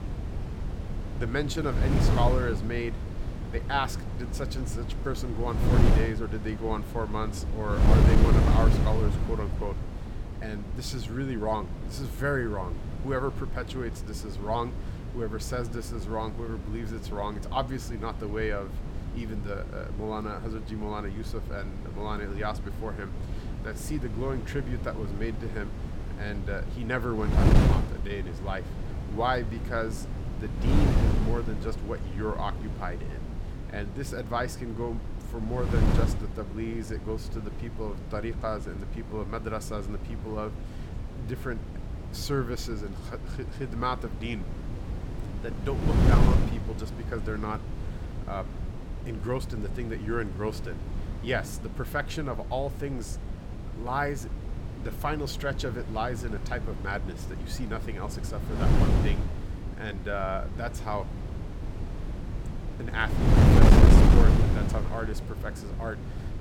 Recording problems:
wind noise on the microphone; heavy; 4 dB below the speech

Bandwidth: 17.5 kHz